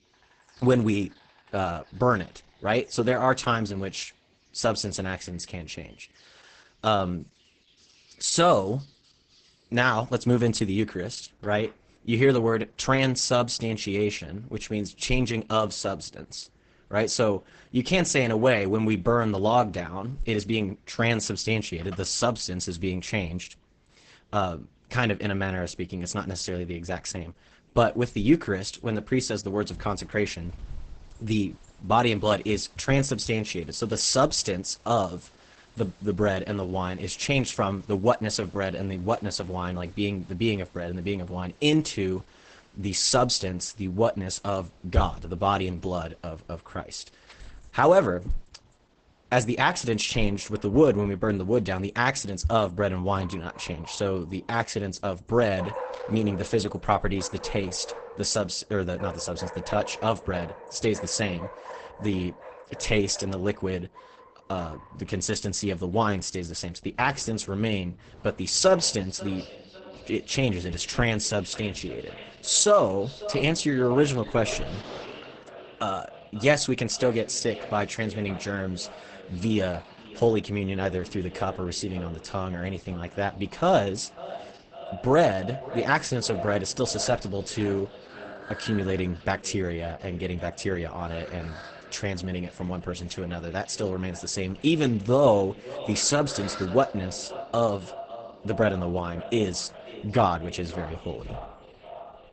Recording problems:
garbled, watery; badly; nothing above 8 kHz
echo of what is said; noticeable; from 1:09 on; 540 ms later, 15 dB below the speech
animal sounds; noticeable; throughout; 20 dB below the speech

